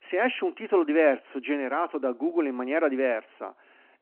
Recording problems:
phone-call audio

